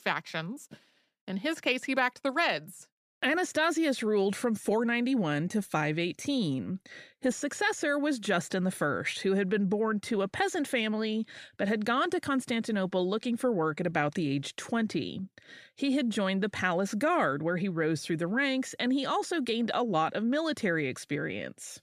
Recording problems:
none

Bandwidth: 14.5 kHz